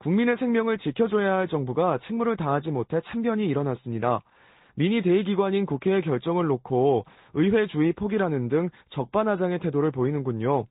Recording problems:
high frequencies cut off; severe; nothing above 4 kHz
garbled, watery; slightly

